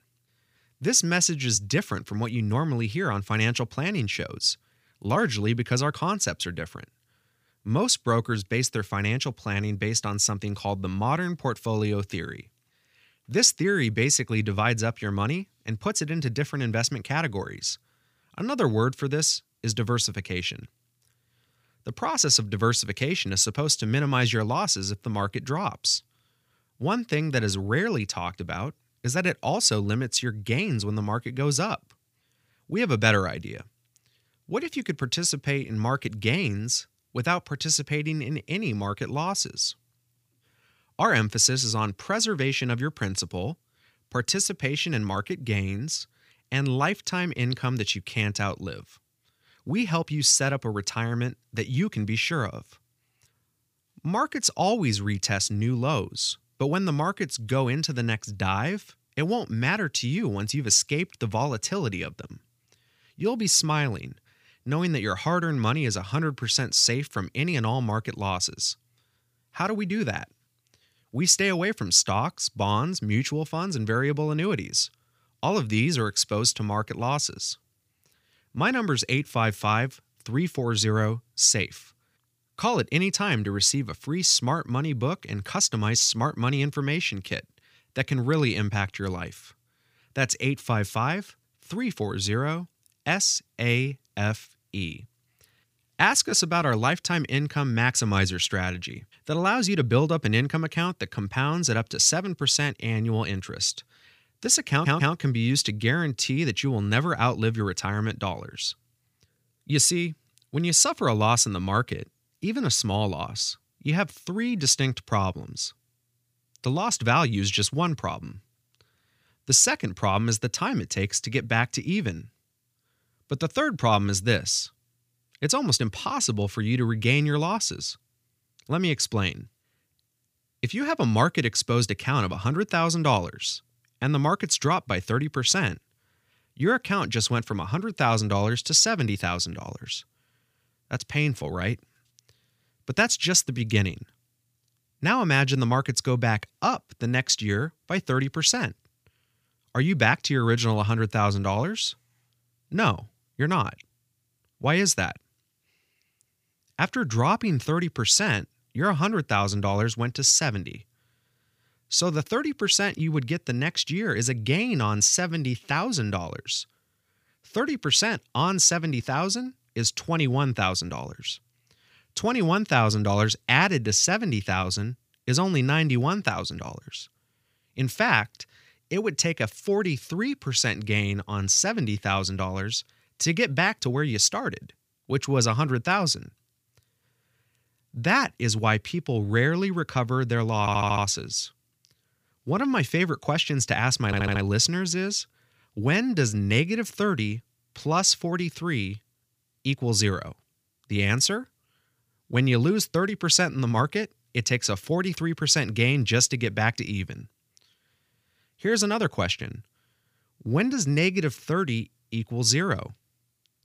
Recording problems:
audio stuttering; at 1:45, at 3:11 and at 3:14

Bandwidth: 15 kHz